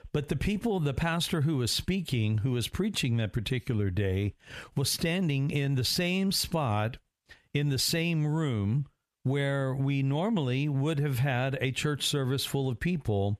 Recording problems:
squashed, flat; somewhat

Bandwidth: 14.5 kHz